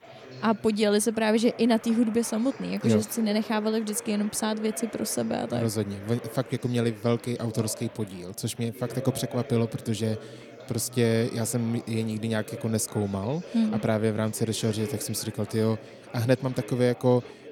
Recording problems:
chatter from many people; noticeable; throughout; 15 dB below the speech

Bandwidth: 17 kHz